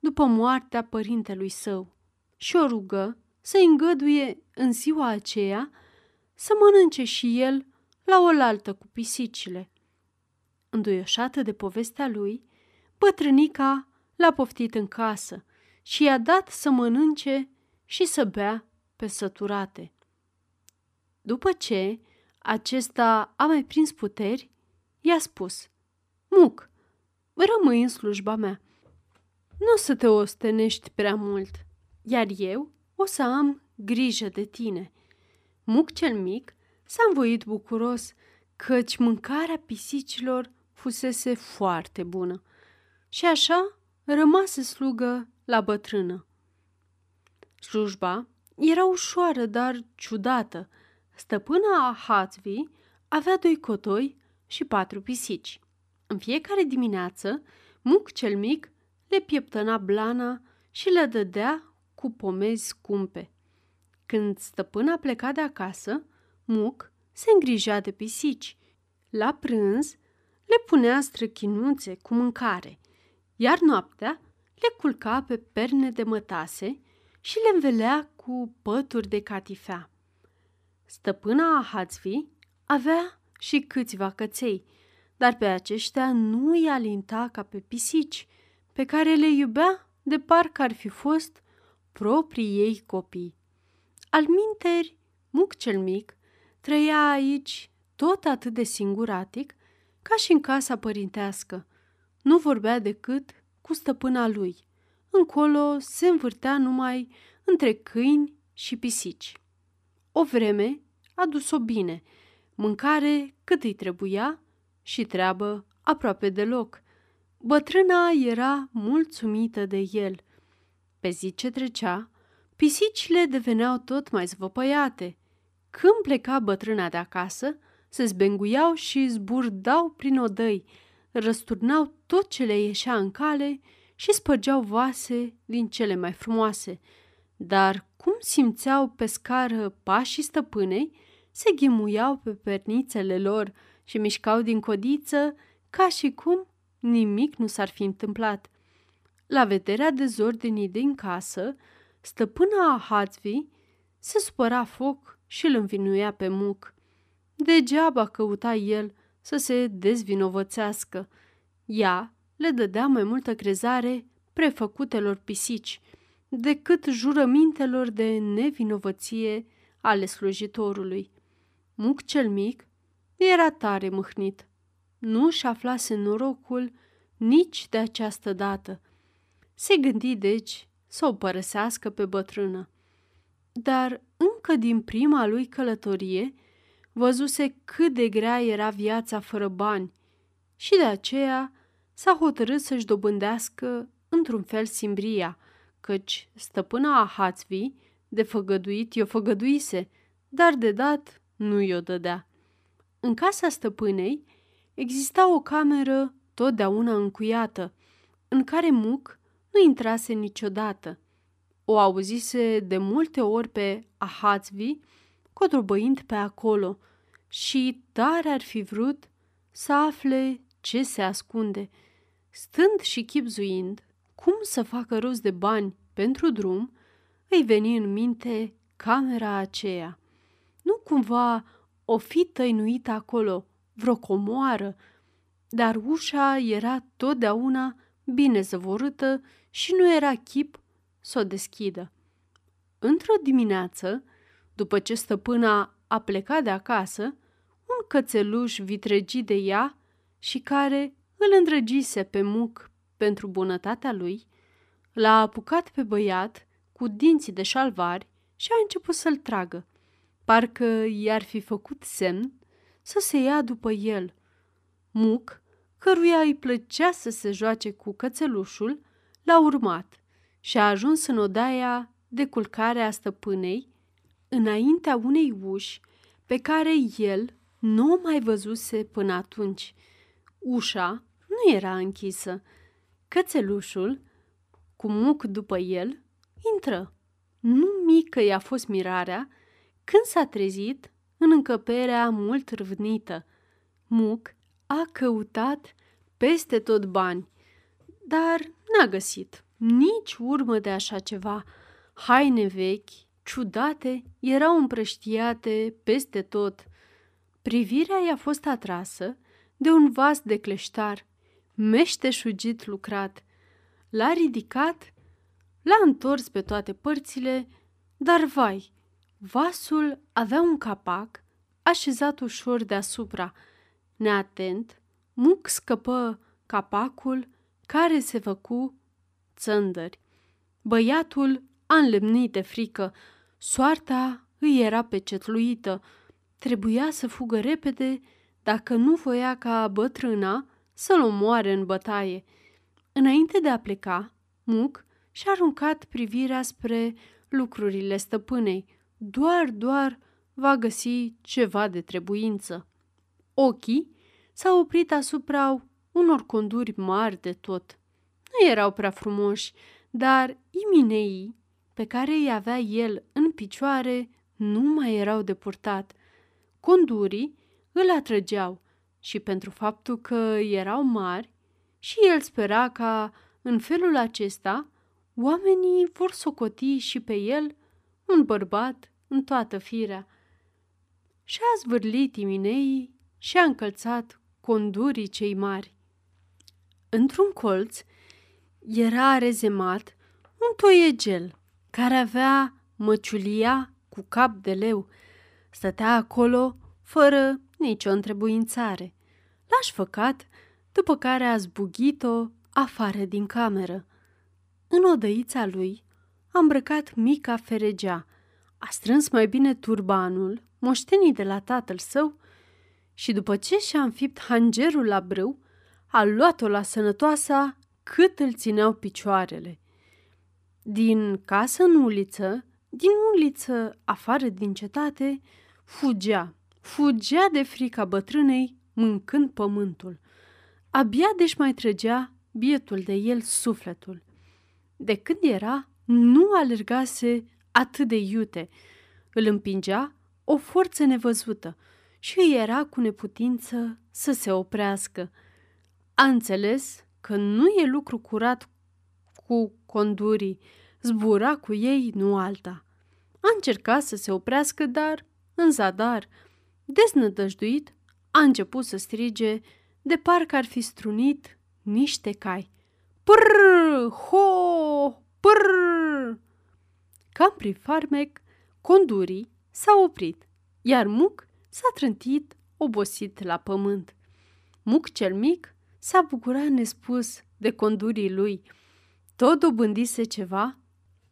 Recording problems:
none

